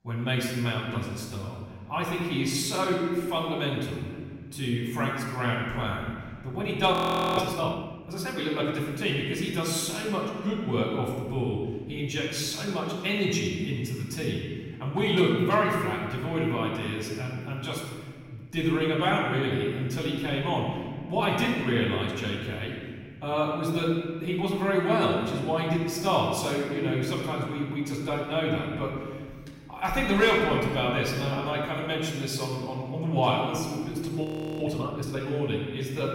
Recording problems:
off-mic speech; far
room echo; noticeable; dies away in 1.9 s
audio freezing; at 7 s and at 34 s

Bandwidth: 16 kHz